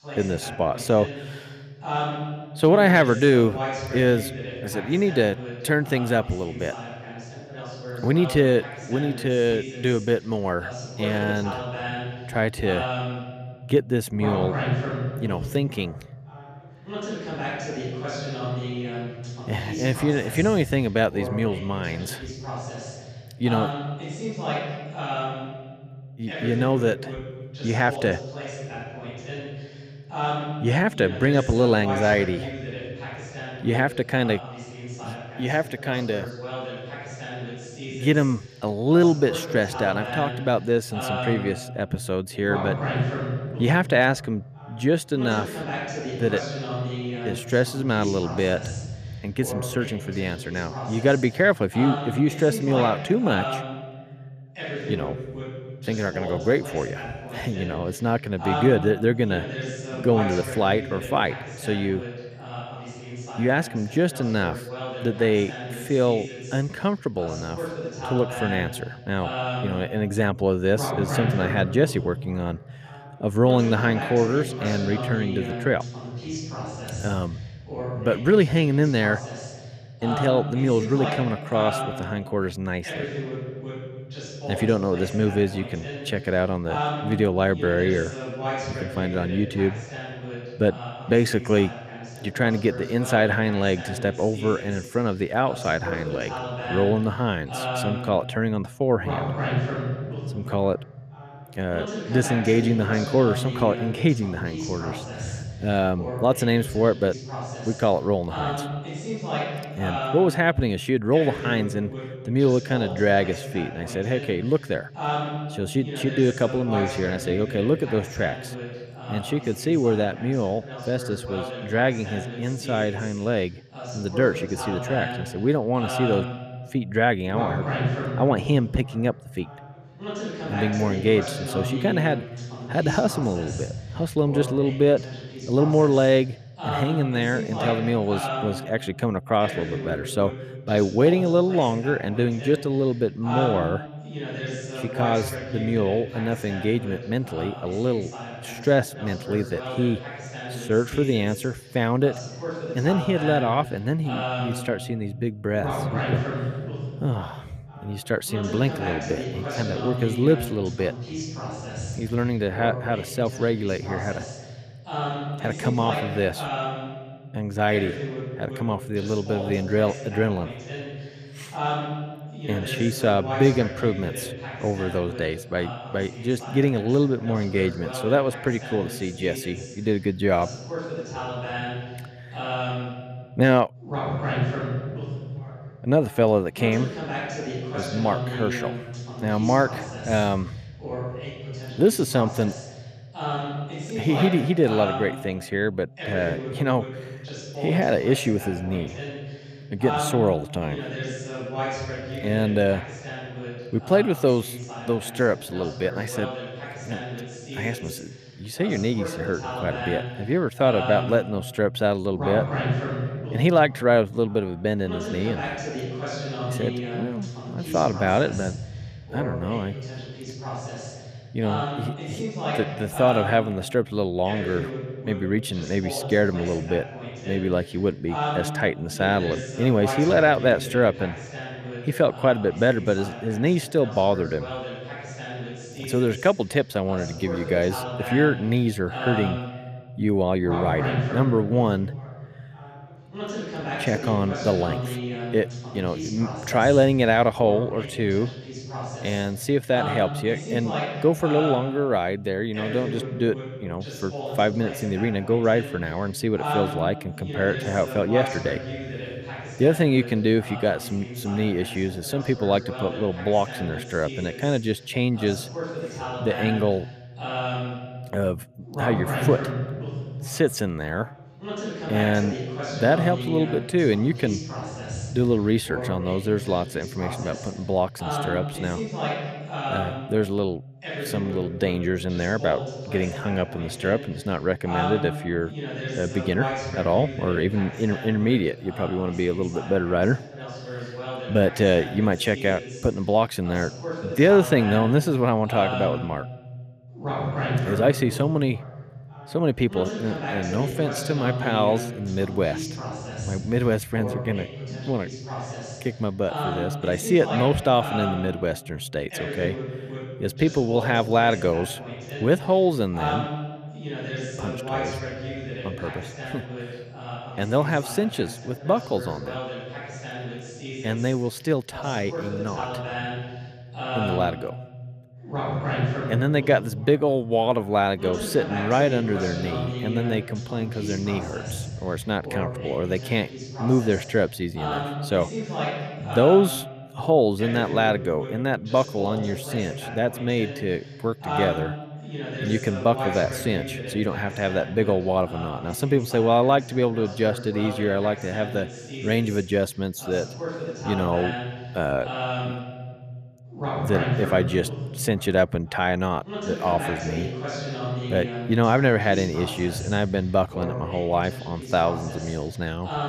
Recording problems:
voice in the background; loud; throughout; 8 dB below the speech

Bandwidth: 14.5 kHz